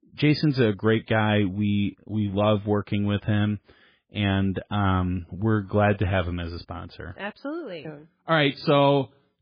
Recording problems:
garbled, watery; badly; nothing above 5 kHz

